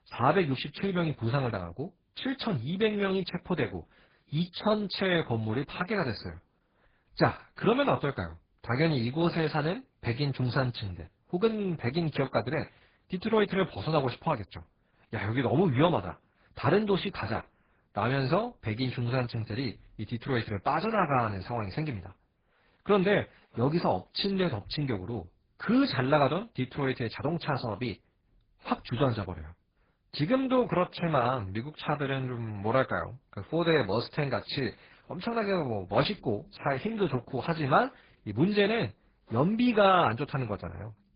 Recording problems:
garbled, watery; badly; nothing above 5 kHz

